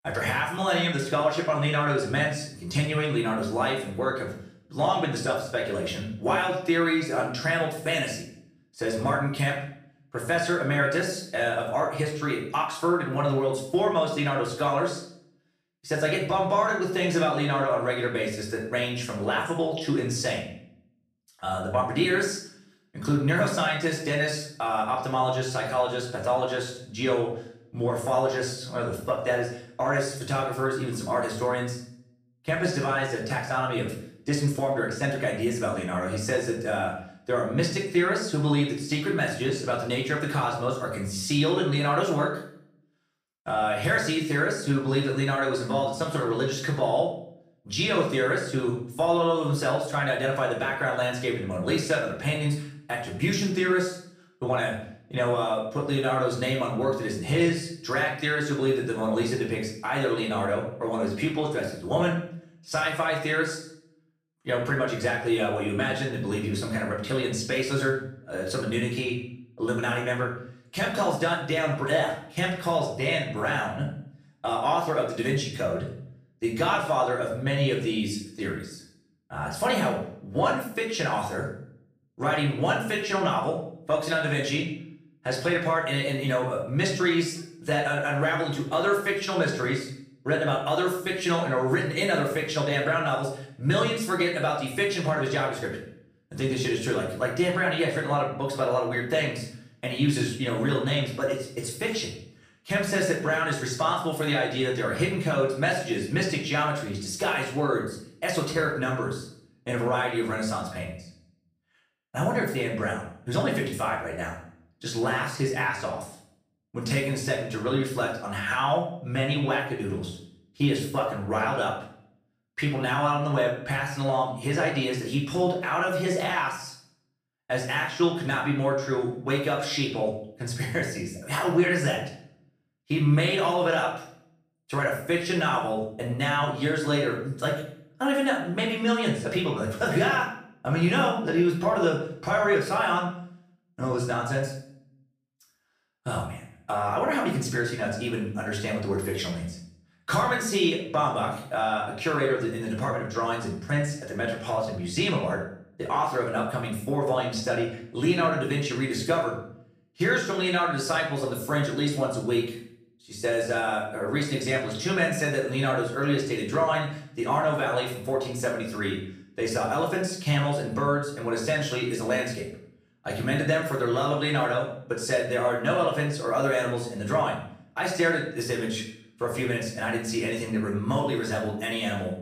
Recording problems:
off-mic speech; far
room echo; noticeable; dies away in 0.6 s

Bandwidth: 15 kHz